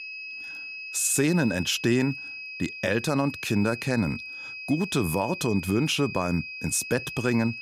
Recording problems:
high-pitched whine; loud; throughout; 2.5 kHz, 9 dB below the speech

